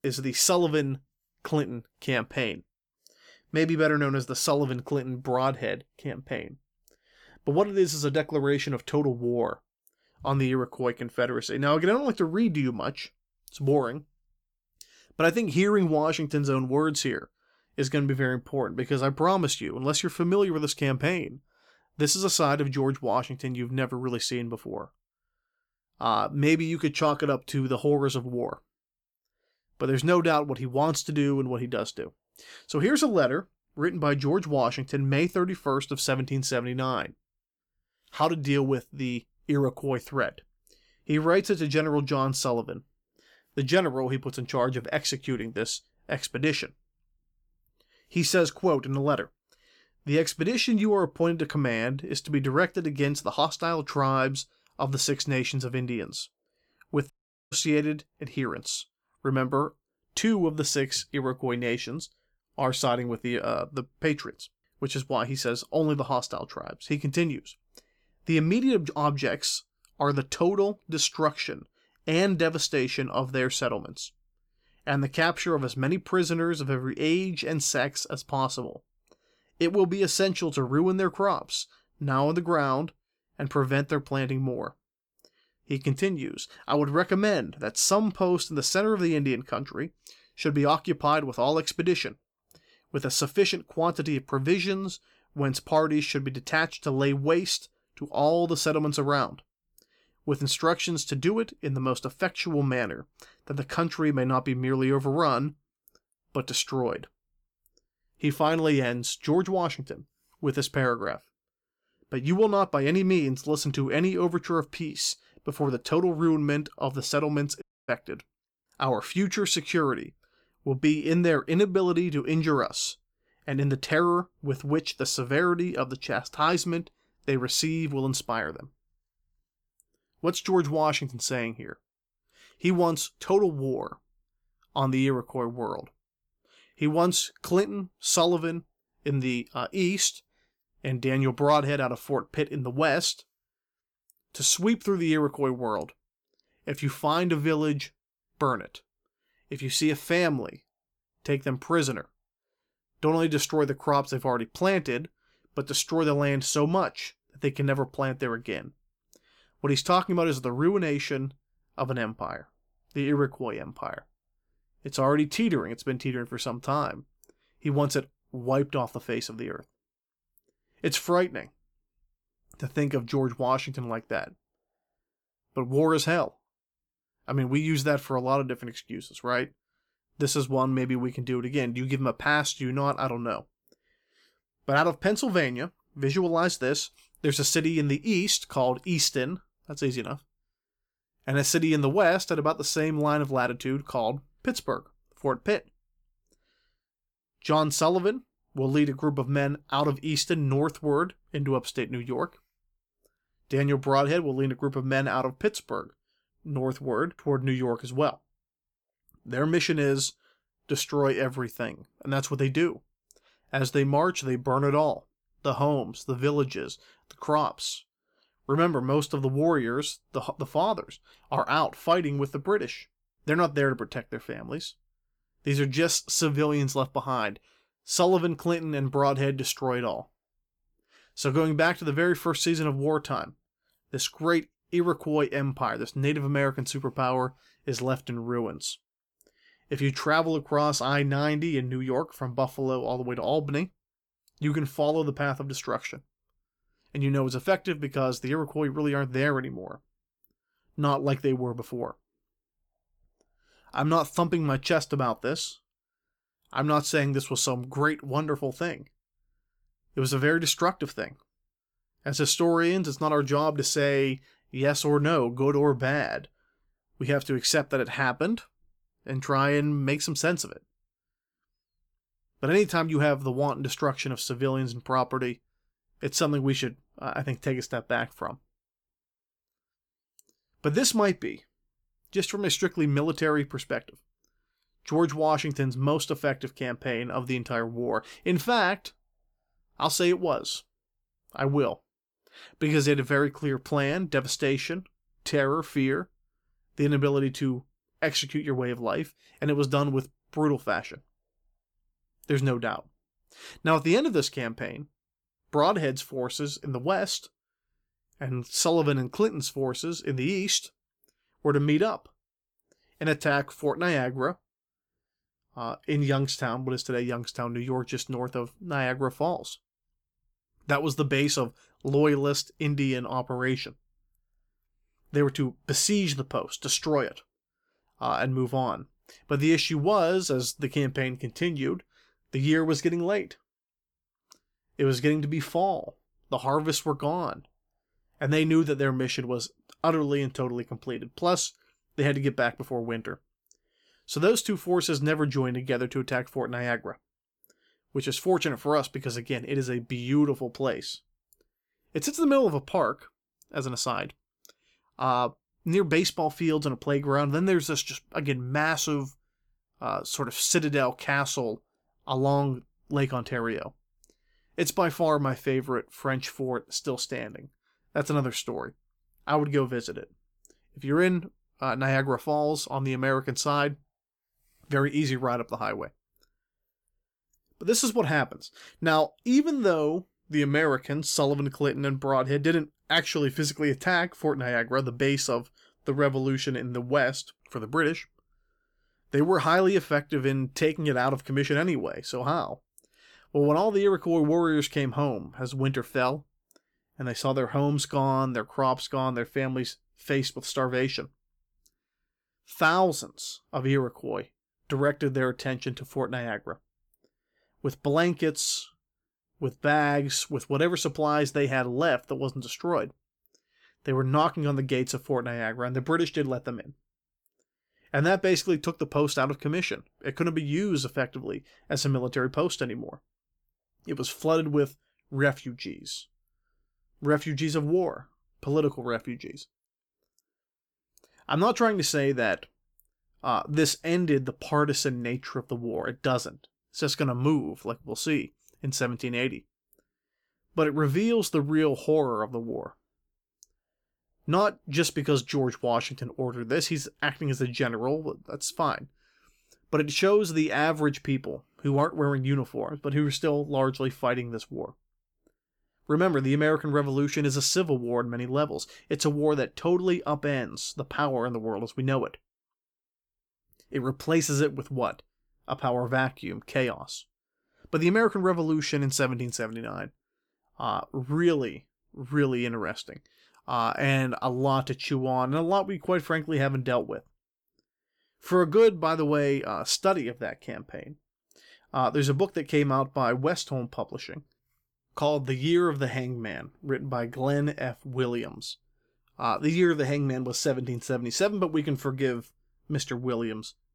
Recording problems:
audio cutting out; at 57 s and at 1:58

